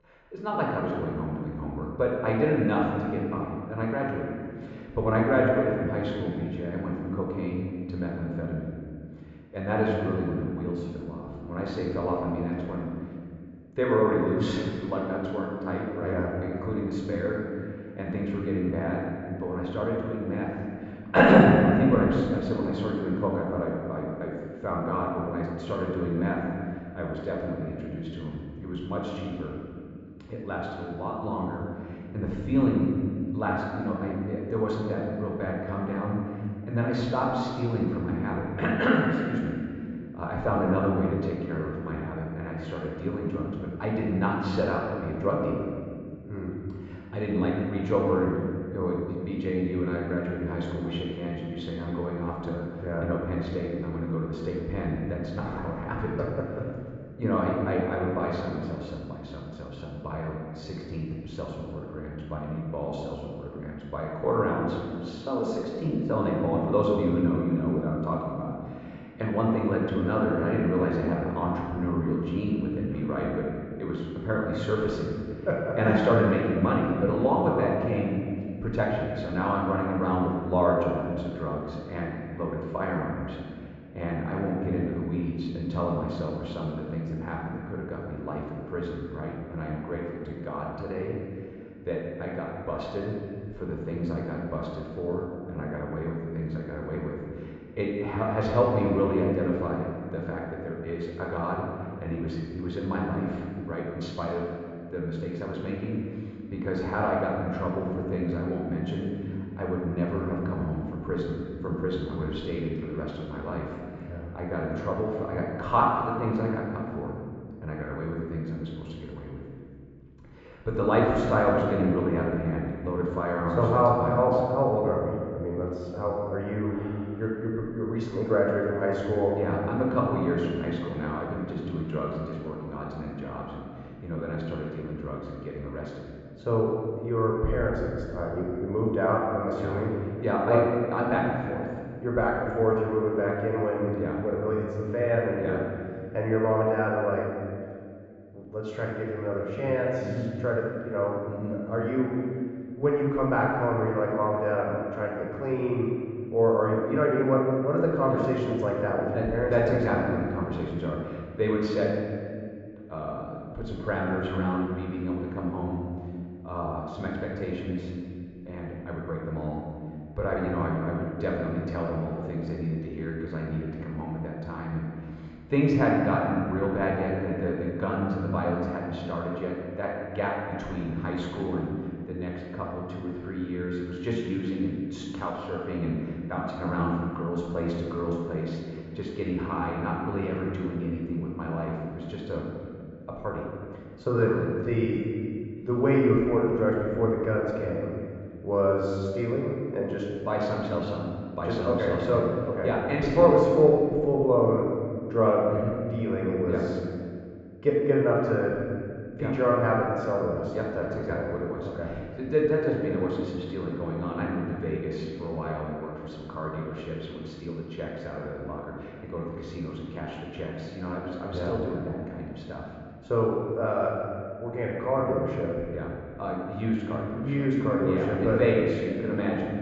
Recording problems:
room echo; noticeable; dies away in 2 s
high frequencies cut off; noticeable; nothing above 8 kHz
off-mic speech; somewhat distant
muffled; very slightly; fading above 2.5 kHz

